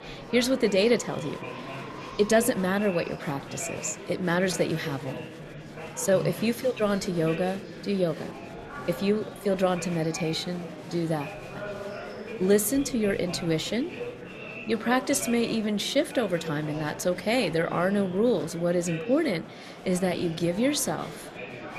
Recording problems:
murmuring crowd; noticeable; throughout; 10 dB below the speech

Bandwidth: 13.5 kHz